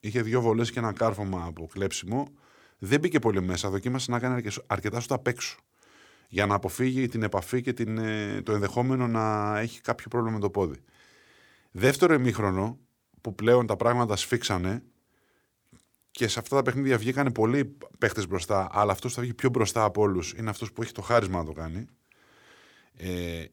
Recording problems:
none

